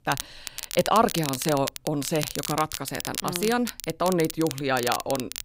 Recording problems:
crackle, like an old record; loud; 7 dB below the speech

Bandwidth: 15.5 kHz